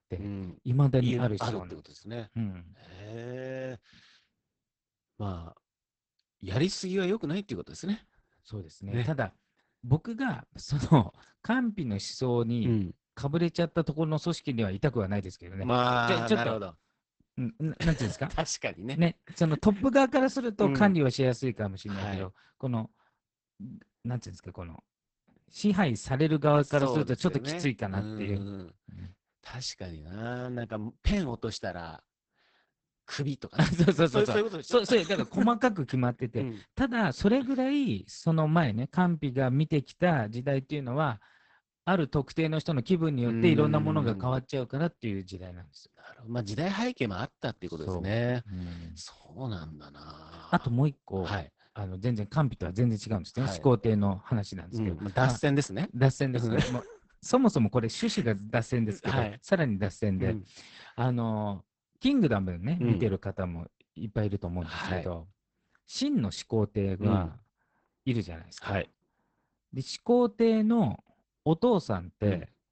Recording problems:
garbled, watery; badly; nothing above 8 kHz

